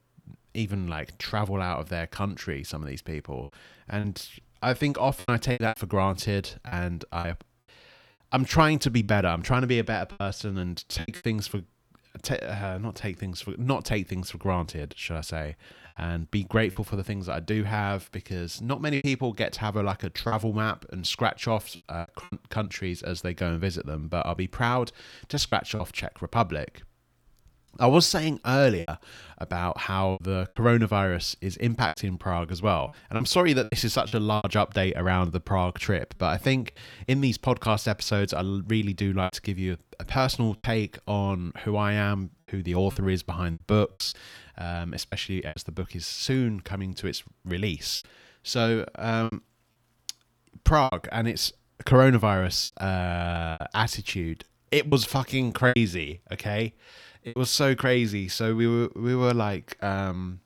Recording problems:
choppy; very; 5% of the speech affected

